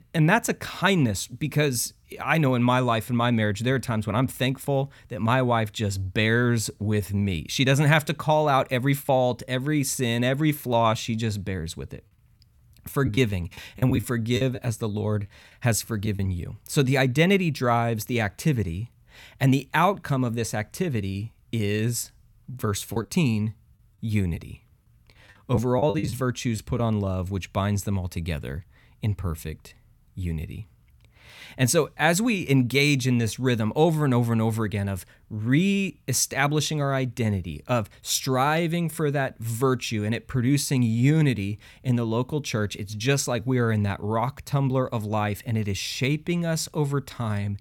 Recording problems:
choppy; very; from 13 to 16 s and from 23 to 27 s; 9% of the speech affected

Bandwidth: 17 kHz